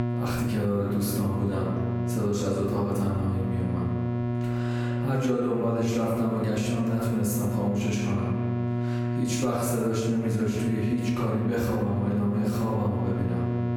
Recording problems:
off-mic speech; far
room echo; noticeable; dies away in 1.2 s
squashed, flat; somewhat
electrical hum; loud; throughout; 60 Hz, 6 dB below the speech

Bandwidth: 17.5 kHz